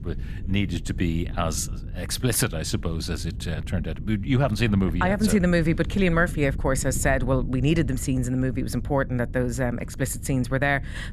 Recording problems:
wind noise on the microphone; occasional gusts; 20 dB below the speech

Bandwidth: 14 kHz